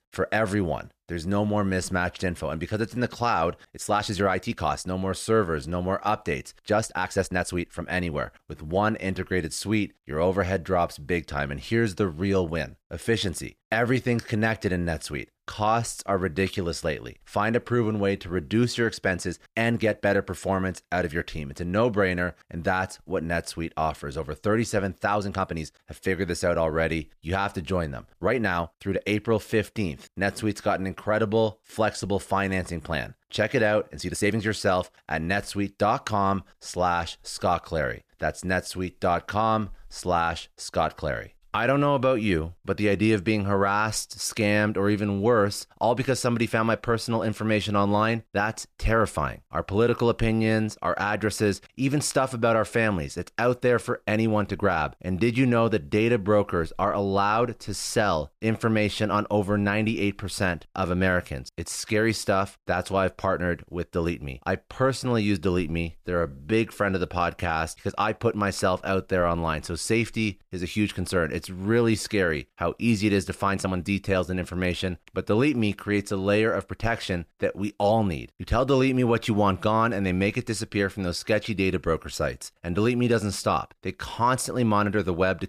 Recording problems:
uneven, jittery; strongly; from 3.5 s to 1:14

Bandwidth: 14.5 kHz